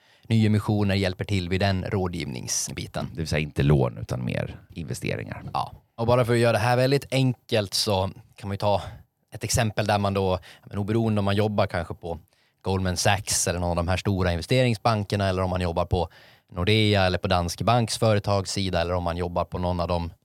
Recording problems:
none

